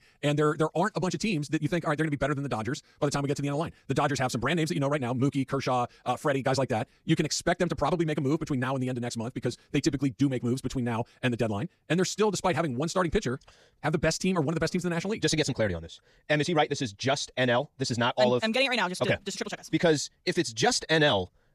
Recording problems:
wrong speed, natural pitch; too fast; 1.8 times normal speed

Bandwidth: 14.5 kHz